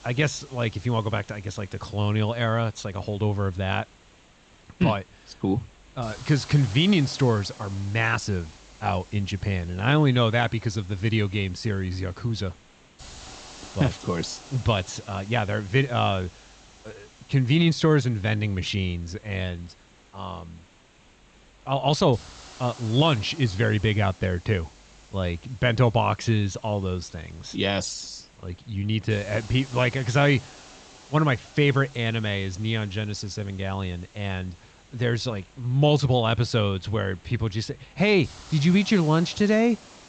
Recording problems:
high frequencies cut off; noticeable; nothing above 8 kHz
hiss; faint; throughout; 25 dB below the speech

